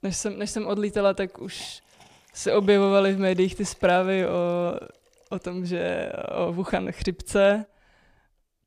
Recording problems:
hiss; faint; throughout; 30 dB below the speech

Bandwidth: 15 kHz